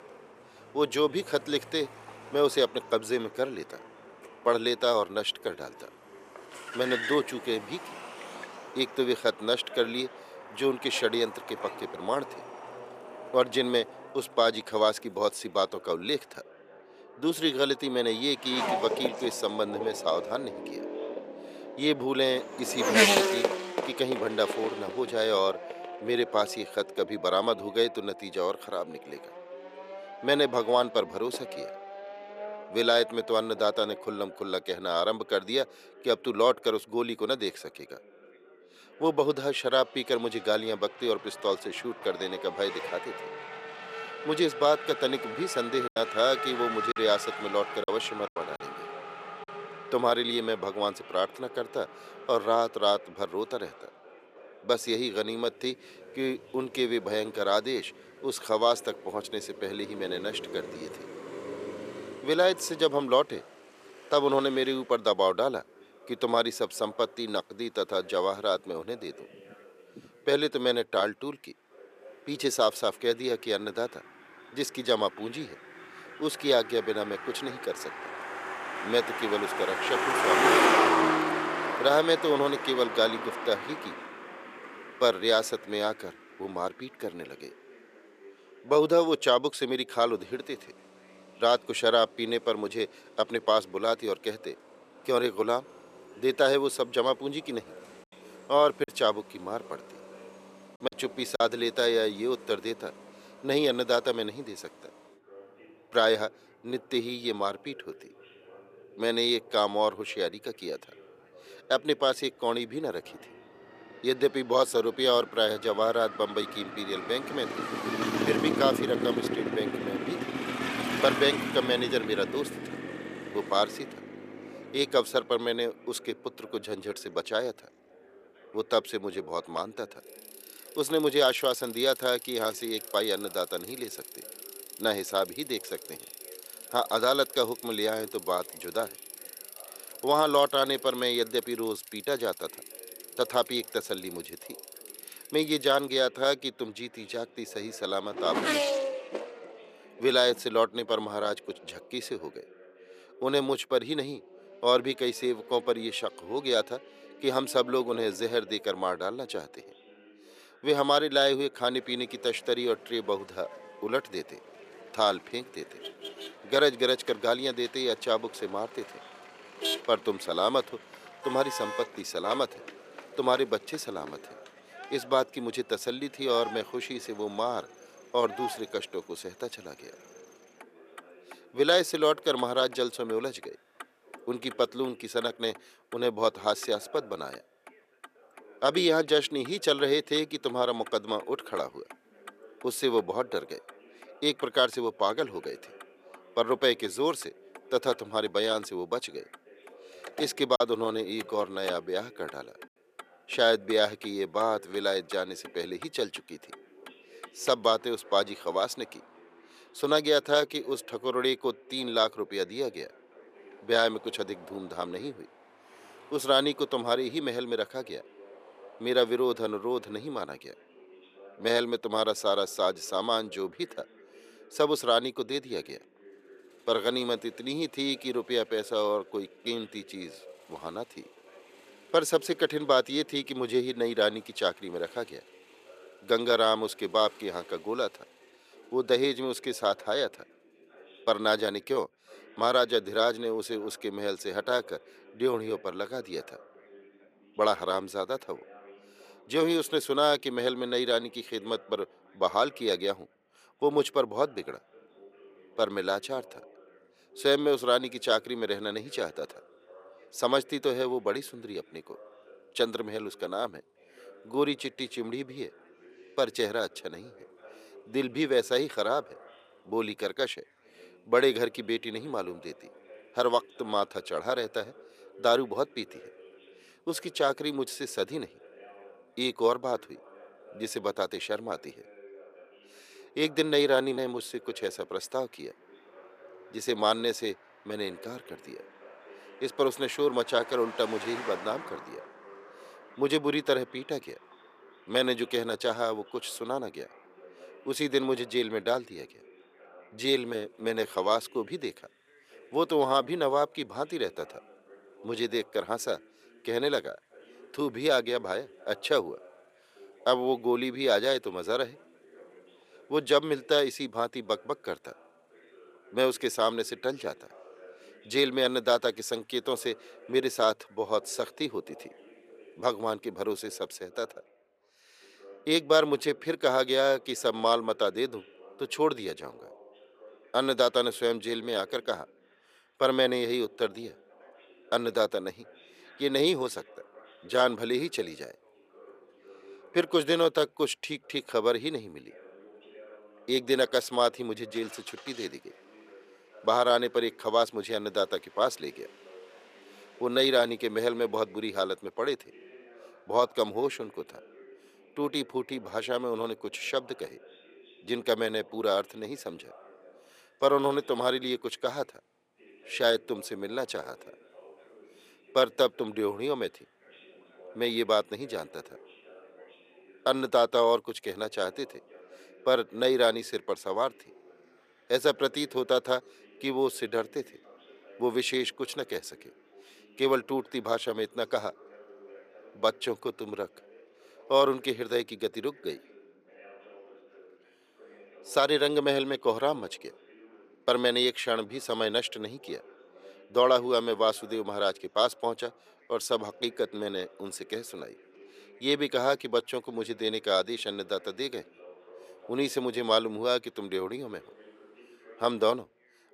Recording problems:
thin; somewhat; fading below 450 Hz
traffic noise; loud; throughout; 7 dB below the speech
background chatter; faint; throughout; 2 voices, 25 dB below the speech
choppy; very; from 46 to 49 s, from 1:39 to 1:41 and at 3:21; 5% of the speech affected

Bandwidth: 14.5 kHz